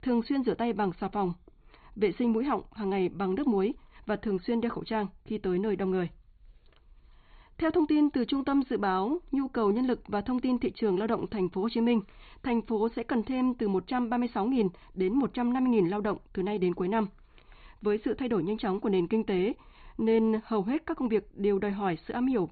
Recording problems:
high frequencies cut off; severe; nothing above 4.5 kHz

